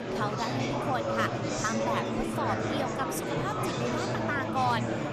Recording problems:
murmuring crowd; very loud; throughout; 3 dB above the speech

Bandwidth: 14 kHz